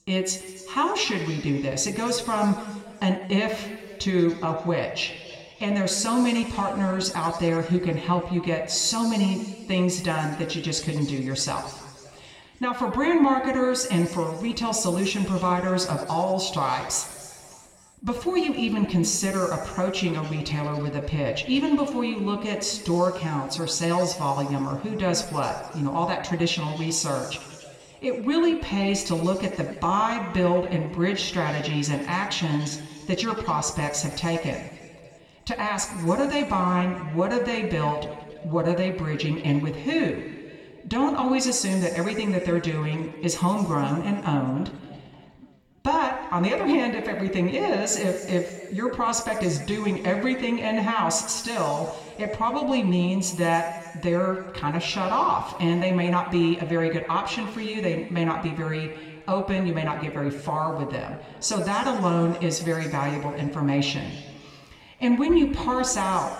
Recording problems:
room echo; noticeable; dies away in 2.1 s
off-mic speech; somewhat distant

